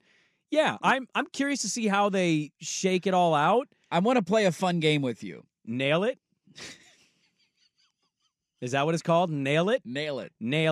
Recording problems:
abrupt cut into speech; at the end

